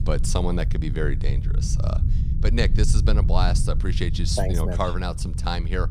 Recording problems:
low rumble; noticeable; throughout; 10 dB below the speech

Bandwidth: 15.5 kHz